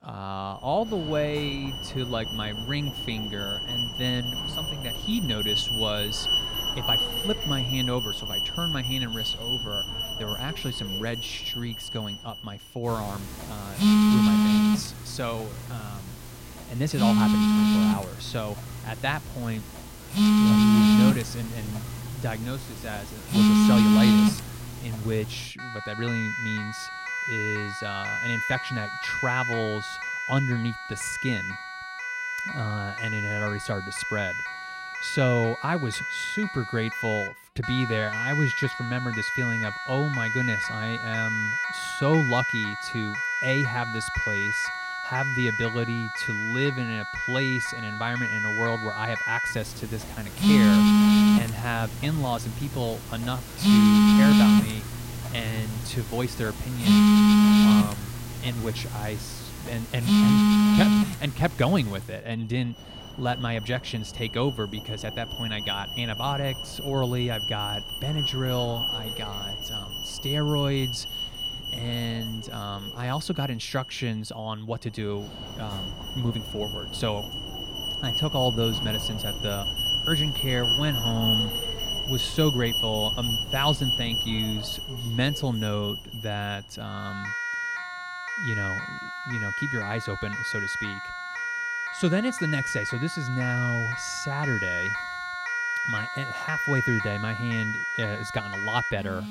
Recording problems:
alarms or sirens; very loud; throughout; 5 dB above the speech

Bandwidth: 16 kHz